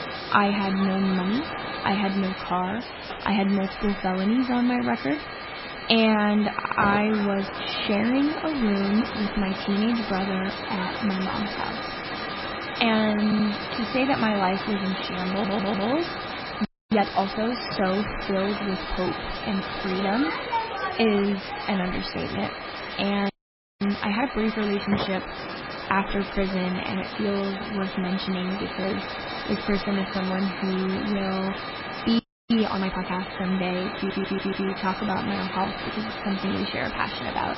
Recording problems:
garbled, watery; badly; nothing above 5.5 kHz
hiss; loud; throughout; 6 dB below the speech
crowd noise; noticeable; throughout; 15 dB below the speech
audio stuttering; 4 times, first at 6.5 s
audio freezing; at 17 s, at 23 s for 0.5 s and at 32 s

